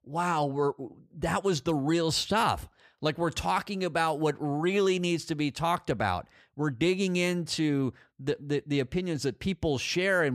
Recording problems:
abrupt cut into speech; at the end

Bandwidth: 15 kHz